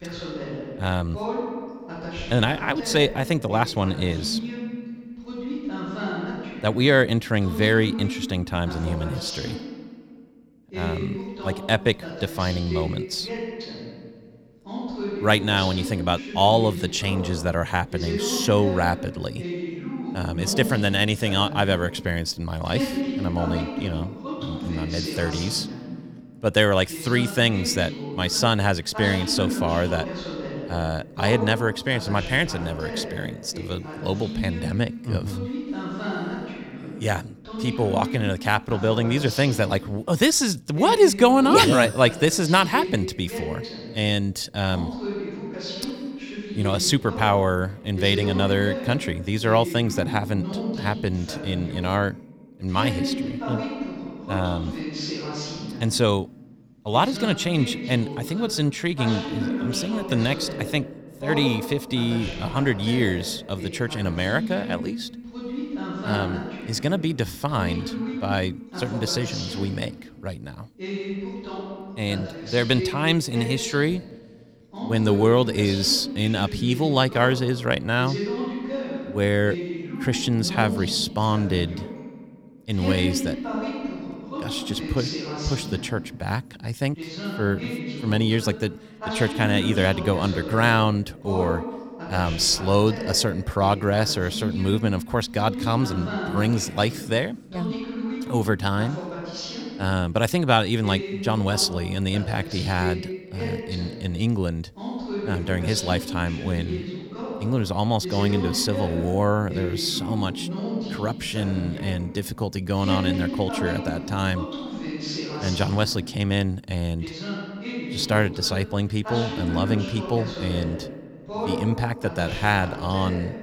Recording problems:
voice in the background; loud; throughout; 8 dB below the speech

